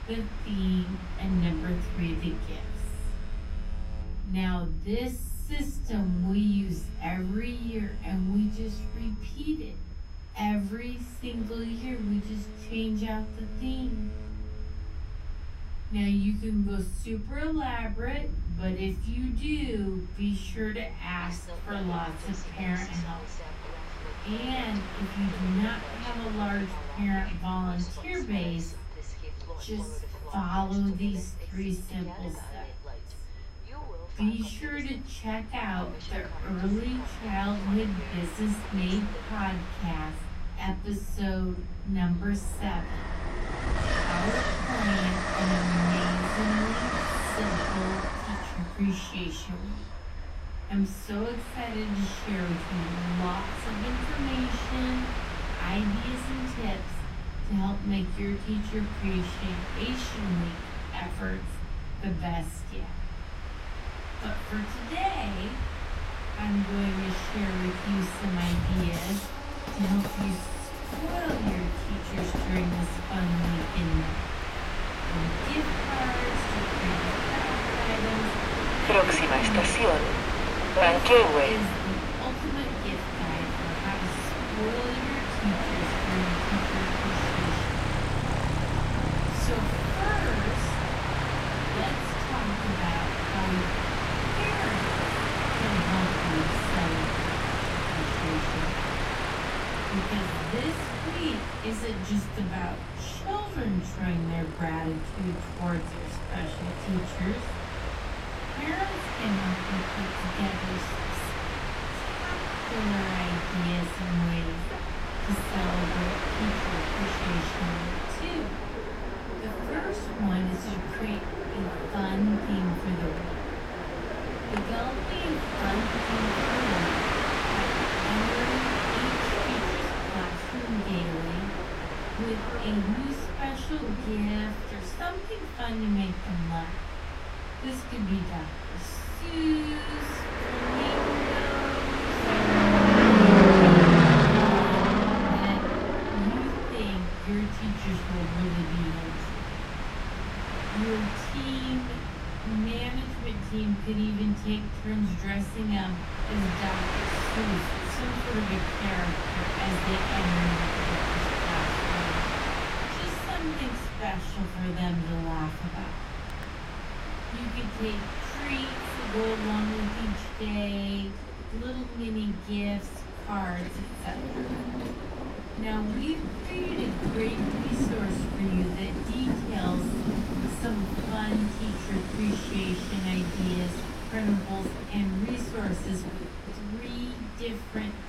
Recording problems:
off-mic speech; far
wrong speed, natural pitch; too slow; 0.6 times normal speed
room echo; very slight; dies away in 0.3 s
train or aircraft noise; very loud; throughout; 3 dB above the speech
high-pitched whine; faint; throughout; 5 kHz, 30 dB below the speech
low rumble; faint; throughout; 20 dB below the speech

